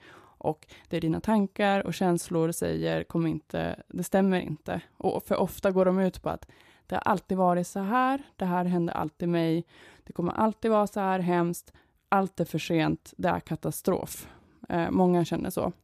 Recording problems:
none

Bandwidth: 14.5 kHz